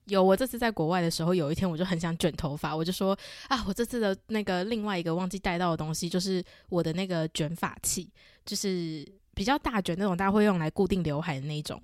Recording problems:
none

